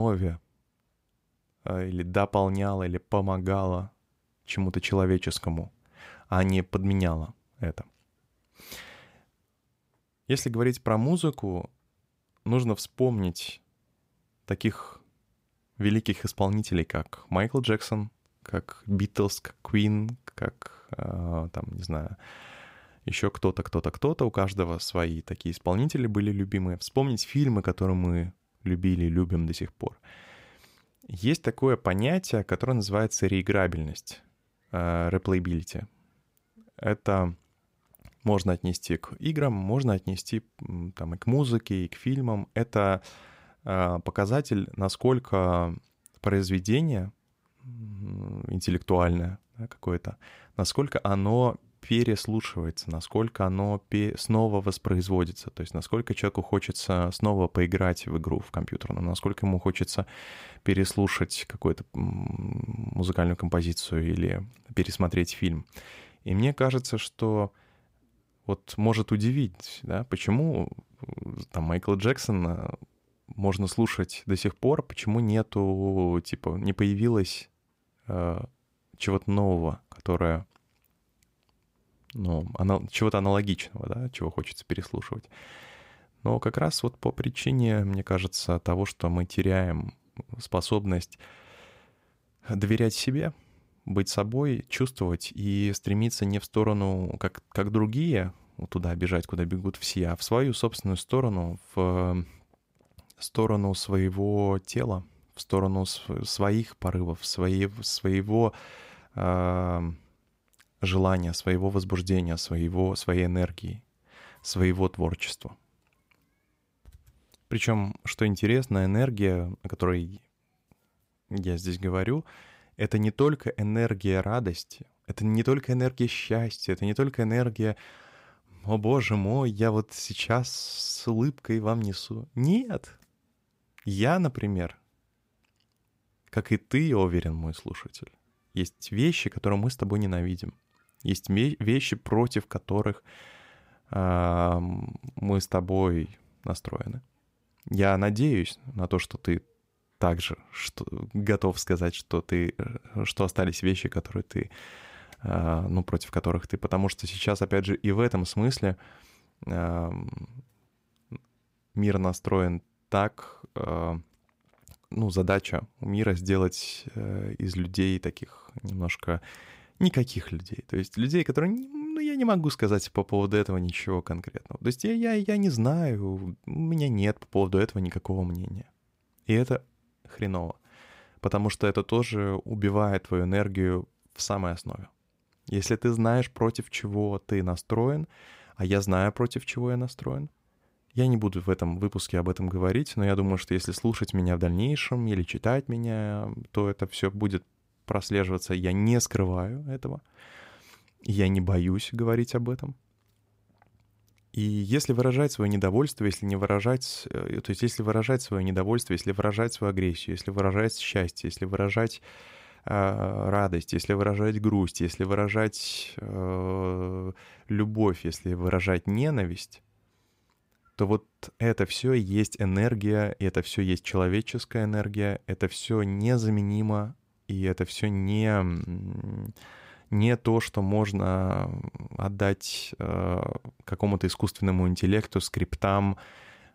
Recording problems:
abrupt cut into speech; at the start

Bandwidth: 15.5 kHz